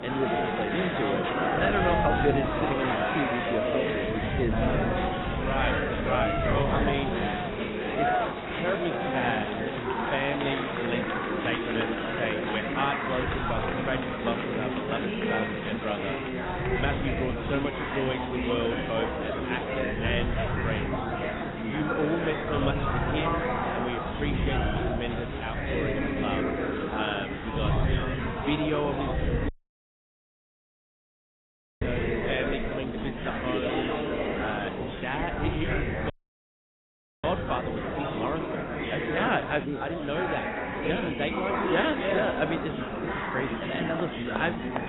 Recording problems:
garbled, watery; badly; nothing above 3.5 kHz
chatter from many people; very loud; throughout; 2 dB above the speech
wind noise on the microphone; occasional gusts; 15 dB below the speech
hiss; very faint; throughout; 20 dB below the speech
audio cutting out; at 29 s for 2.5 s and at 36 s for 1 s

